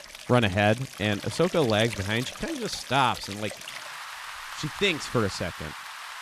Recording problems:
rain or running water; noticeable; throughout; 10 dB below the speech

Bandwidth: 14.5 kHz